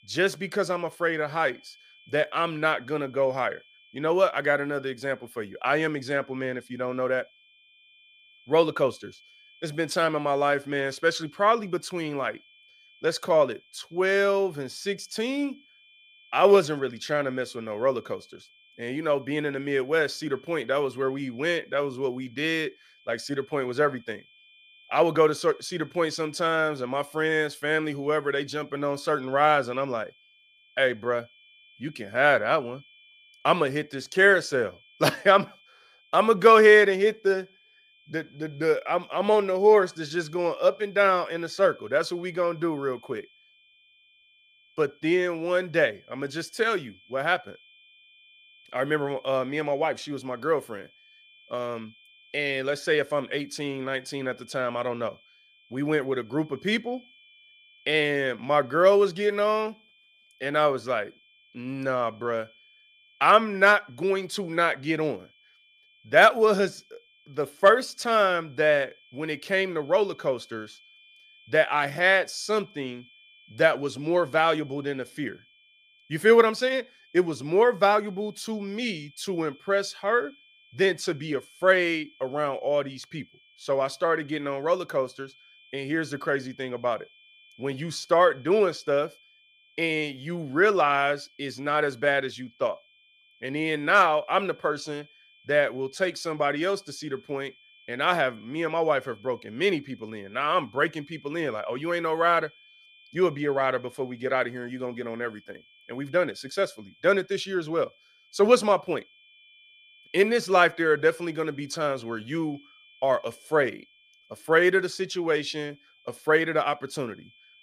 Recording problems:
high-pitched whine; faint; throughout; 2.5 kHz, 30 dB below the speech

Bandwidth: 15 kHz